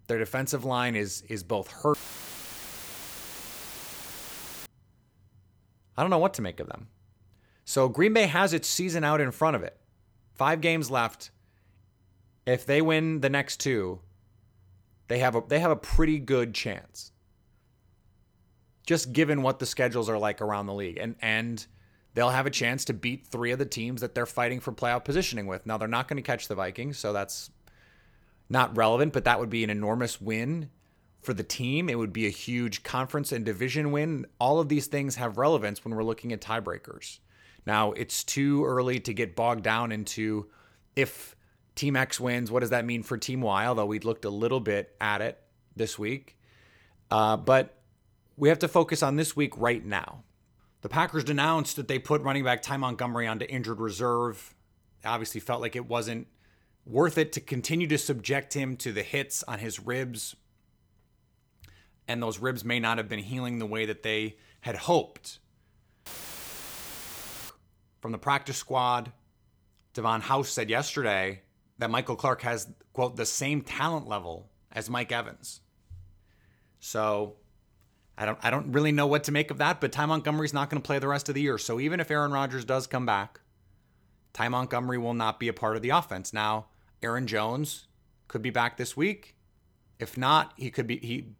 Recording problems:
audio cutting out; filled with static; at 2 s for 2.5 s and at 1:06 for 1.5 s

